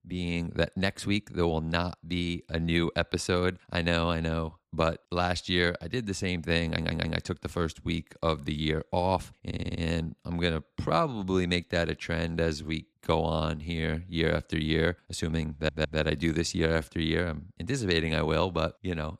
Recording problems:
audio stuttering; at 6.5 s, at 9.5 s and at 16 s

